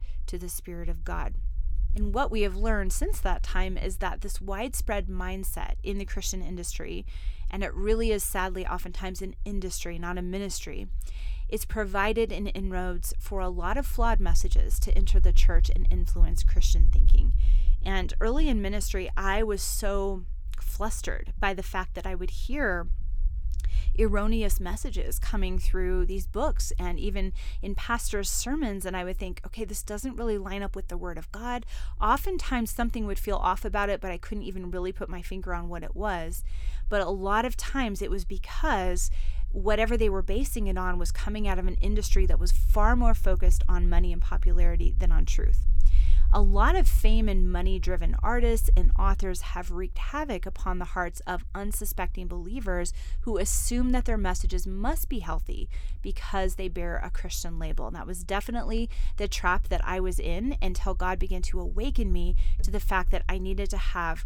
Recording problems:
low rumble; faint; throughout; 25 dB below the speech

